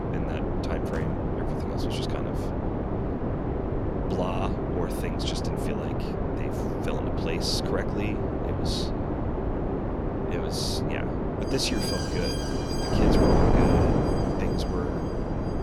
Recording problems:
wind noise on the microphone; heavy; 4 dB above the speech
alarms or sirens; loud; throughout; 8 dB below the speech
traffic noise; very faint; throughout; 20 dB below the speech

